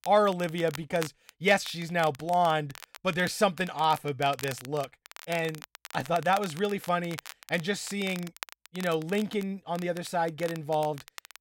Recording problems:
crackle, like an old record; noticeable; 15 dB below the speech

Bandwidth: 16 kHz